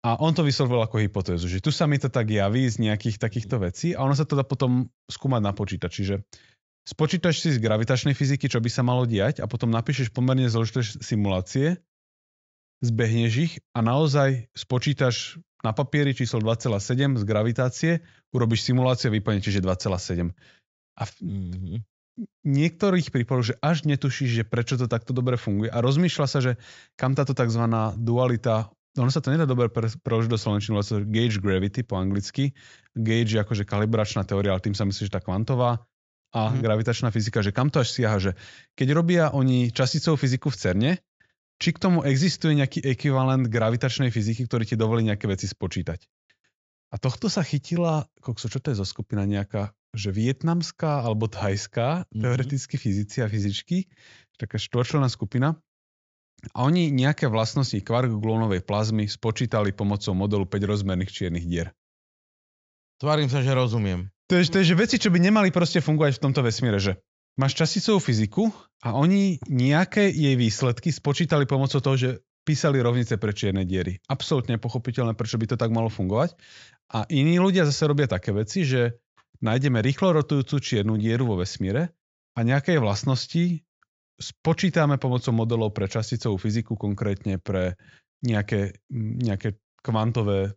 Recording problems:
high frequencies cut off; noticeable; nothing above 7.5 kHz

